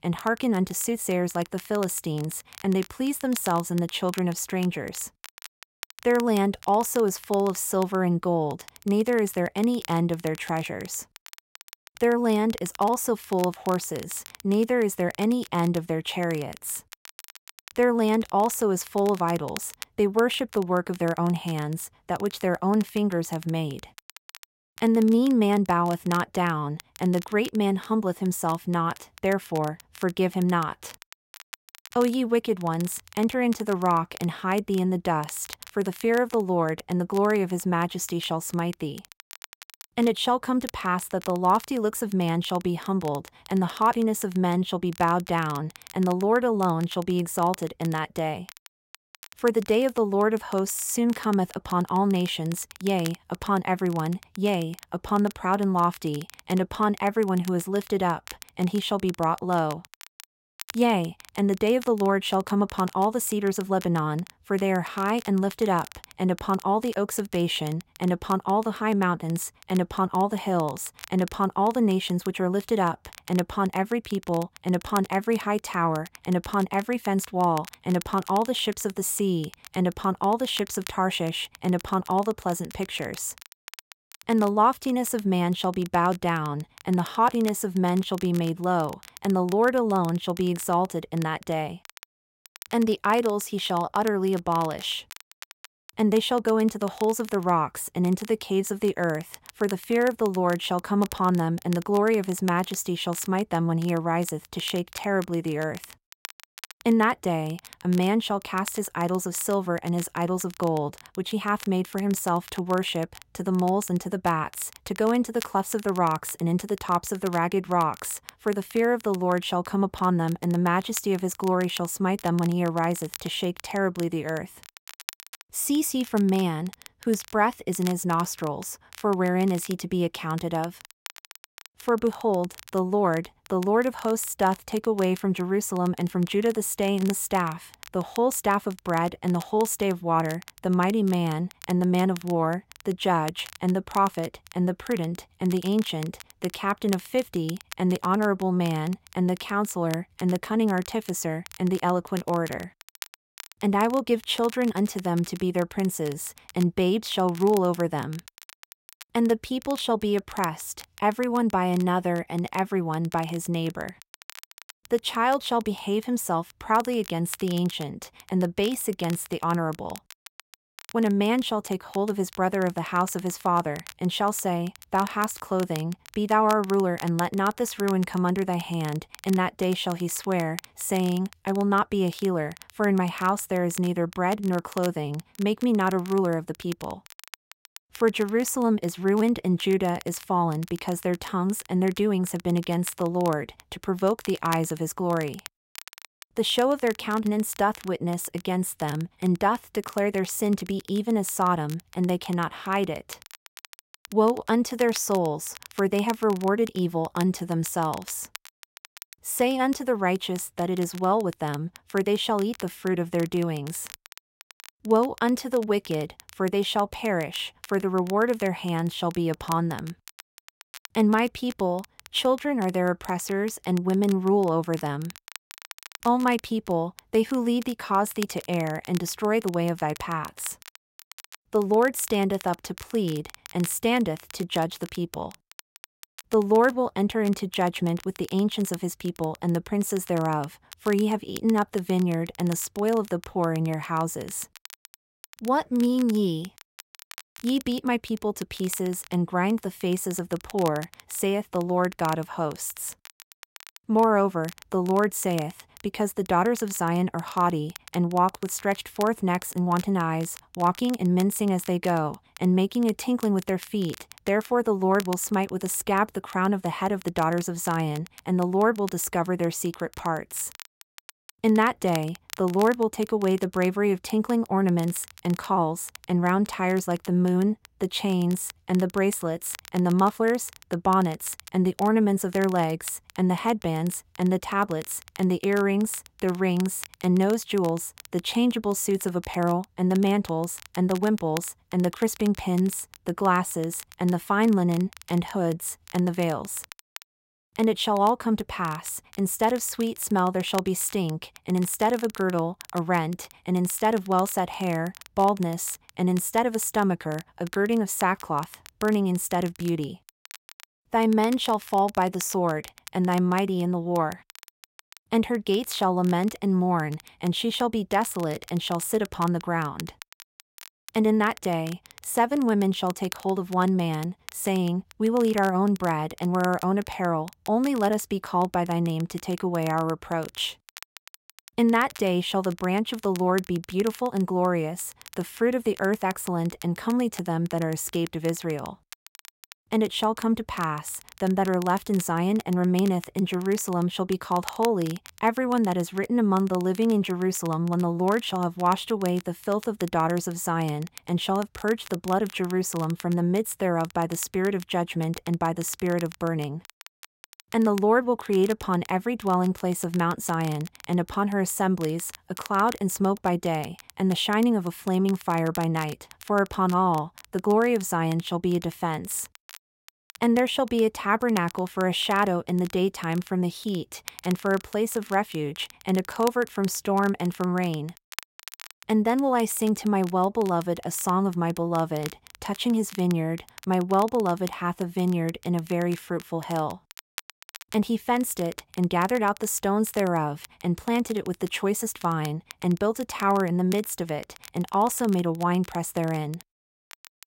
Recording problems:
crackle, like an old record; noticeable; 20 dB below the speech

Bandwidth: 16 kHz